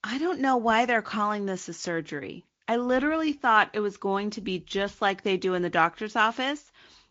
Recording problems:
high frequencies cut off; noticeable; nothing above 7.5 kHz
garbled, watery; slightly

